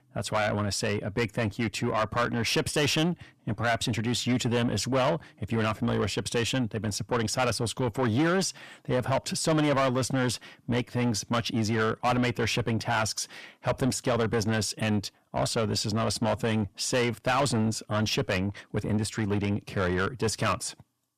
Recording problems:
distortion; heavy; 7 dB below the speech

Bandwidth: 14.5 kHz